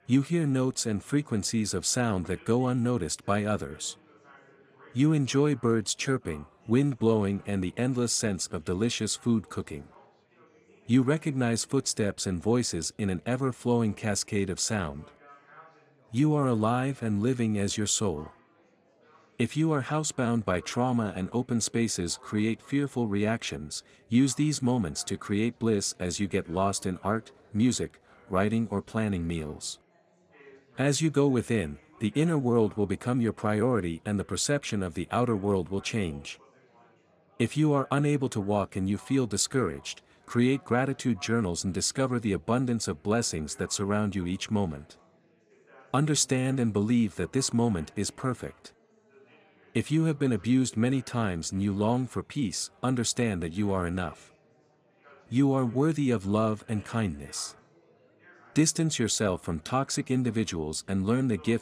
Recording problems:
chatter from many people; faint; throughout; 30 dB below the speech

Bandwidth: 14.5 kHz